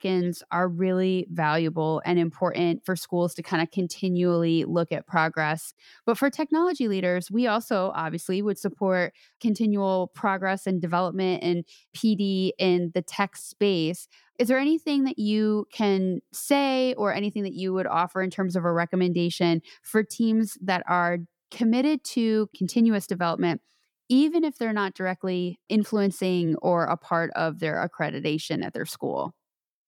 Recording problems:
none

